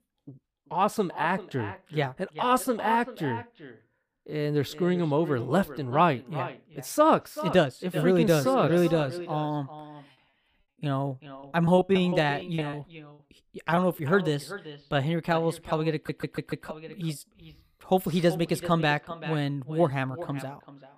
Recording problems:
echo of what is said; noticeable; throughout; 390 ms later, 15 dB below the speech
choppy; very; from 12 to 14 s; 13% of the speech affected
audio stuttering; at 16 s

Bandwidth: 15 kHz